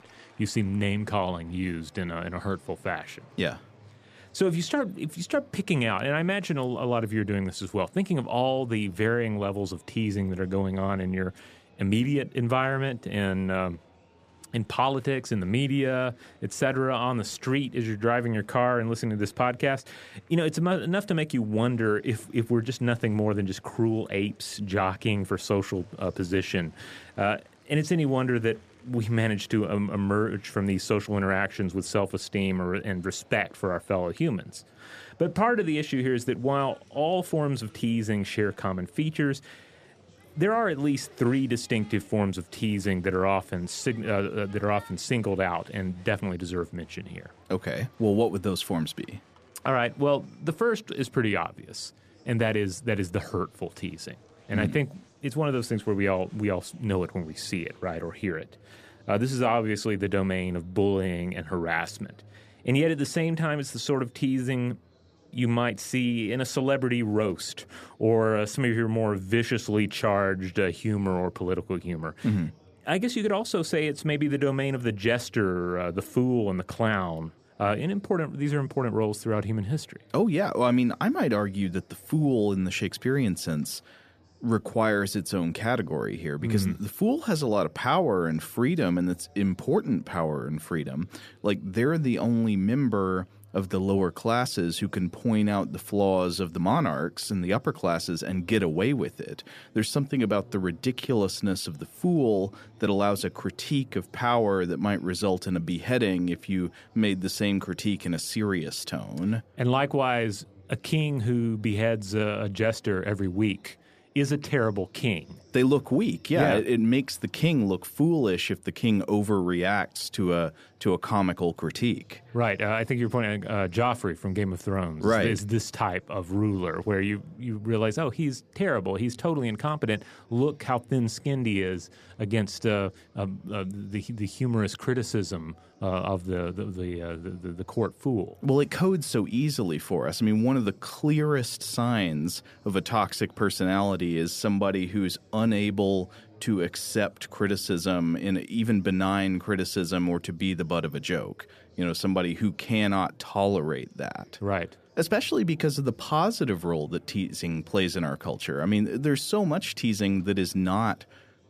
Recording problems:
murmuring crowd; faint; throughout; 30 dB below the speech

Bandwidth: 14.5 kHz